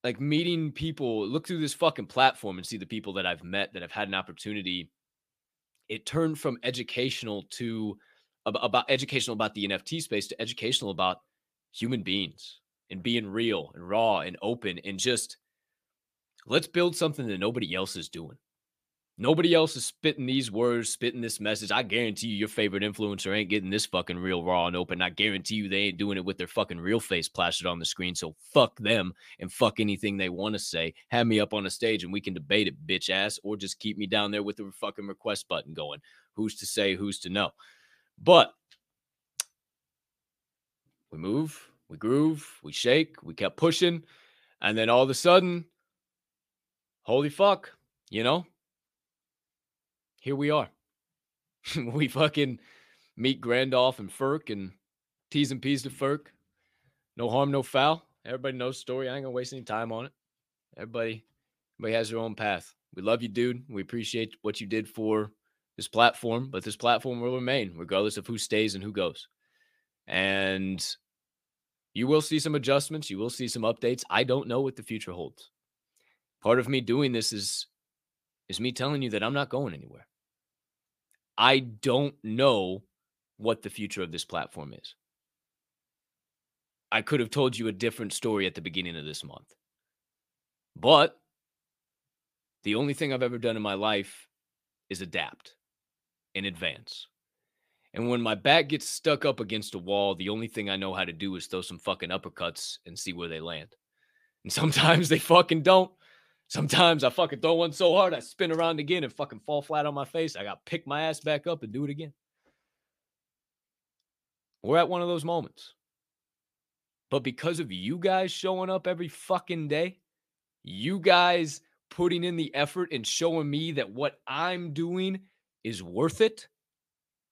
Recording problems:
none

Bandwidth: 15 kHz